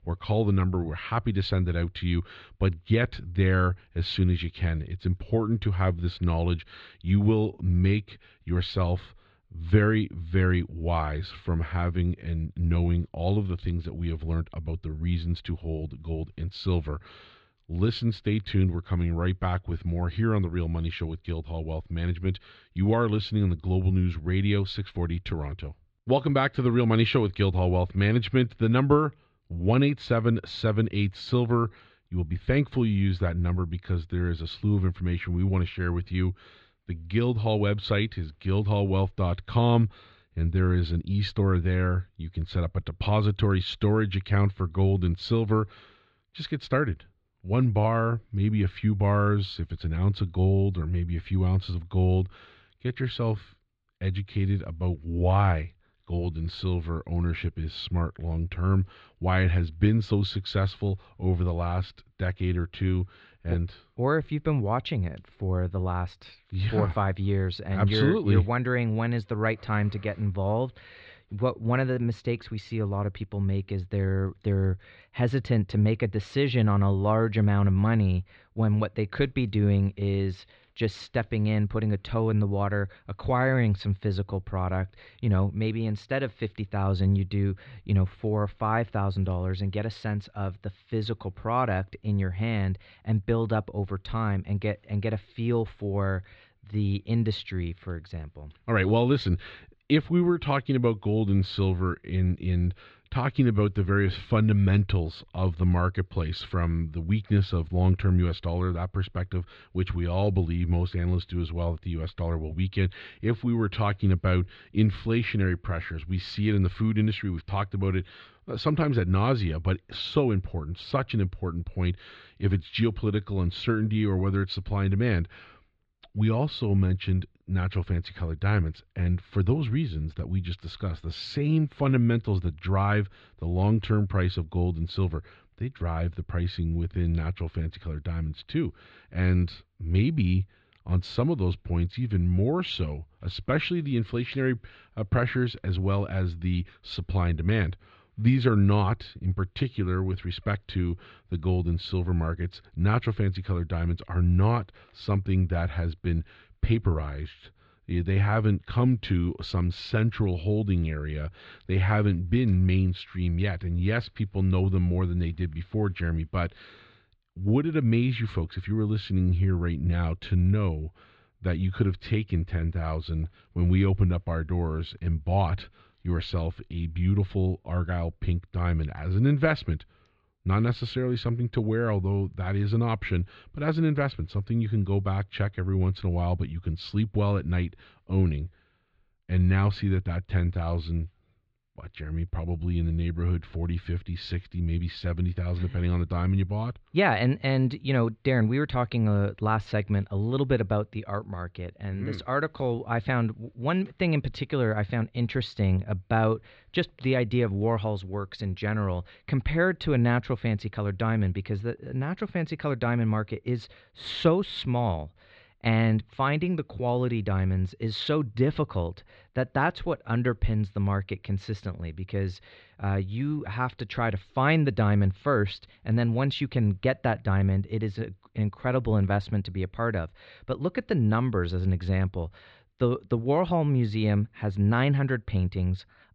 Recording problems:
muffled; slightly; fading above 4 kHz

